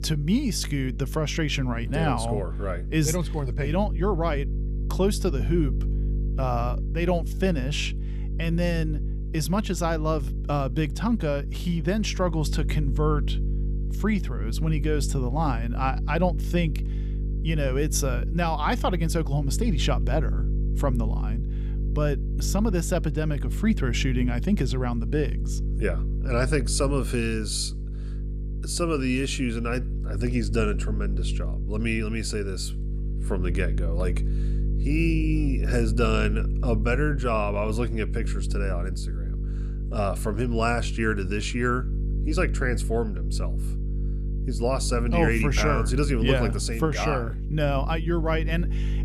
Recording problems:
electrical hum; noticeable; throughout; 50 Hz, 15 dB below the speech

